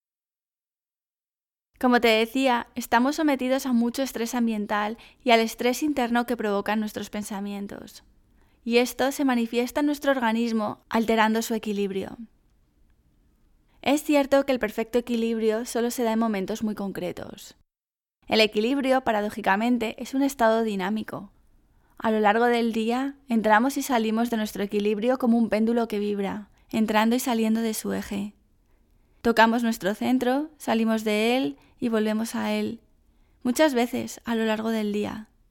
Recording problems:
none

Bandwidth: 17 kHz